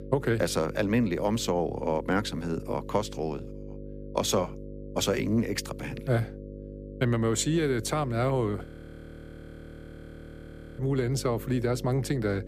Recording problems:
electrical hum; noticeable; throughout; 50 Hz, 15 dB below the speech
audio freezing; at 8.5 s for 2 s

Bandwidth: 15 kHz